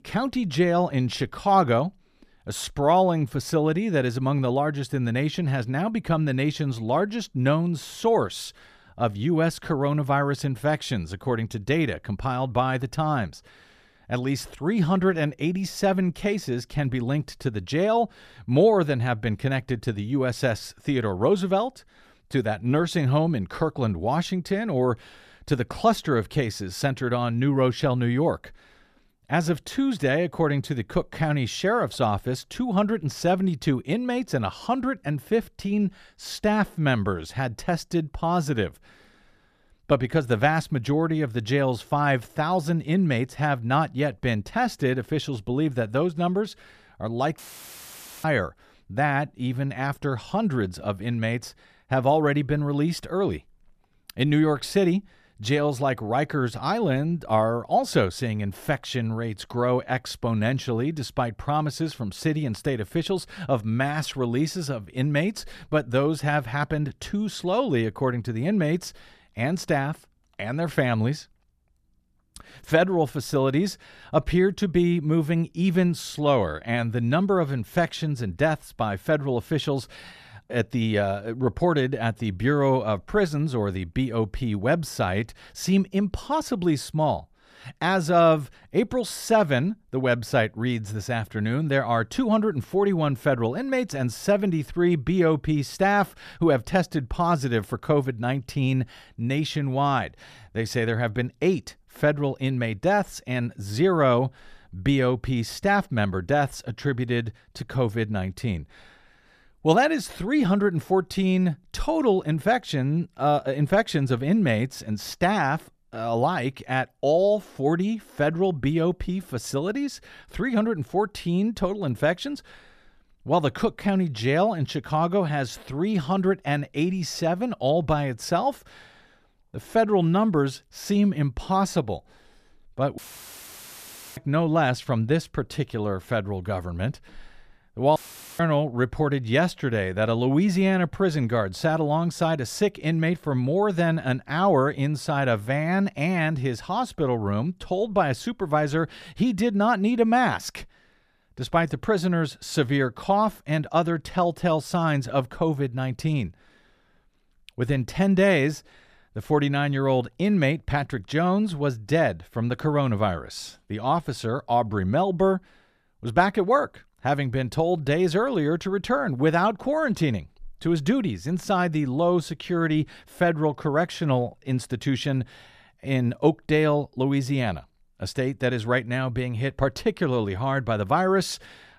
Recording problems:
audio cutting out; filled with static; at 47 s for 1 s, at 2:13 for 1 s and at 2:18

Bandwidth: 14.5 kHz